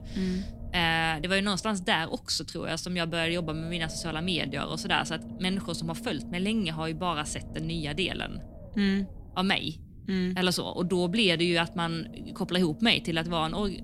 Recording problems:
low rumble; faint; throughout; 20 dB below the speech

